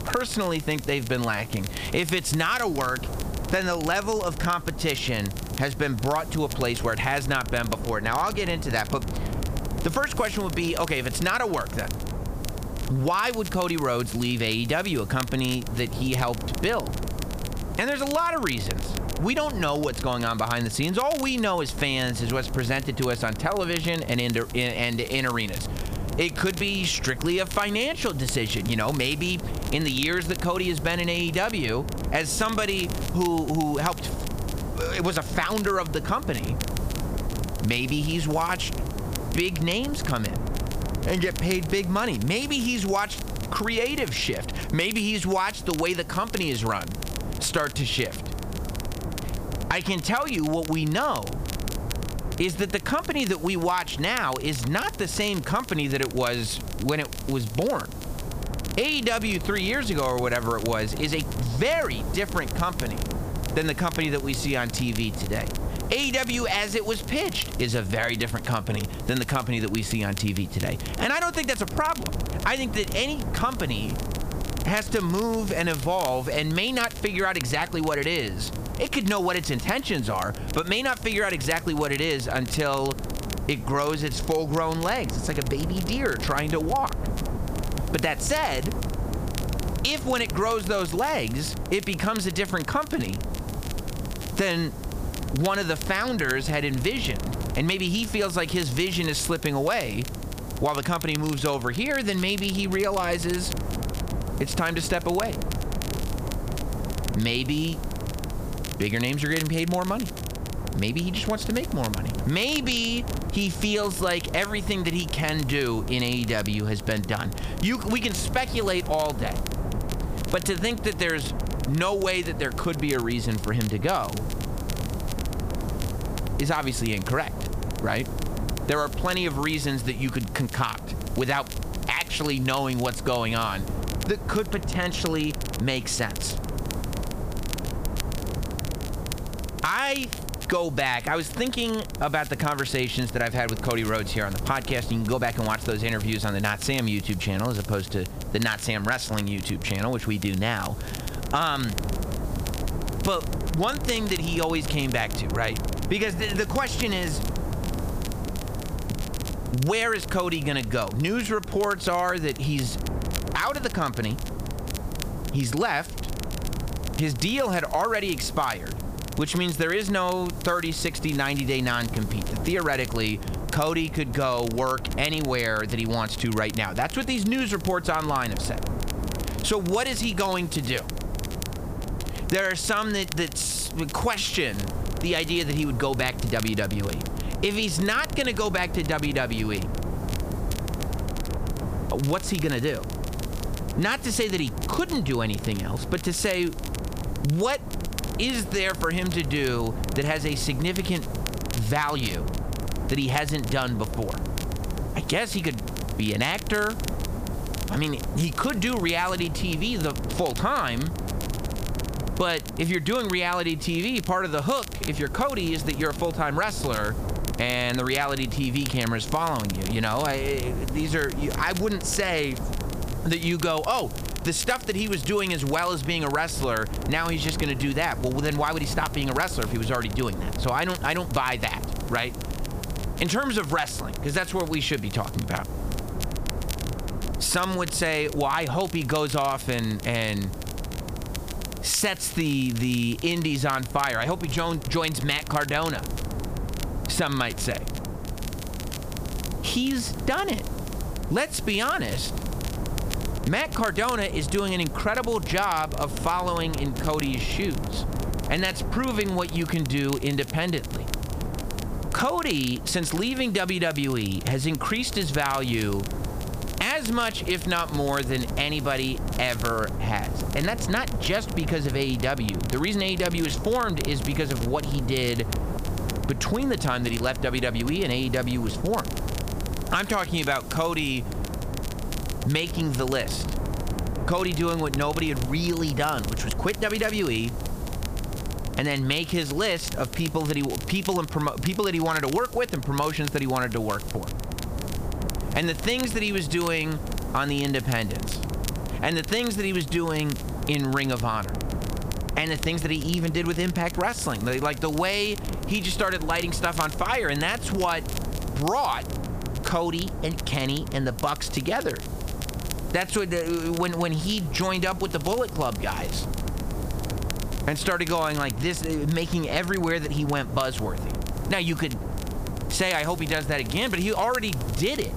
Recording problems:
squashed, flat; somewhat
wind noise on the microphone; occasional gusts; 15 dB below the speech
crackle, like an old record; noticeable; 15 dB below the speech
hiss; faint; throughout; 25 dB below the speech

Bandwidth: 15 kHz